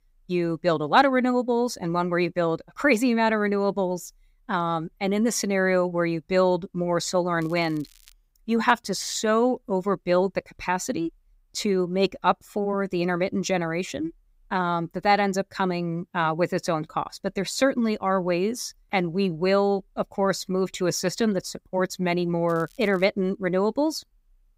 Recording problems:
crackling; faint; at 7.5 s and at 22 s; 30 dB below the speech

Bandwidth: 15.5 kHz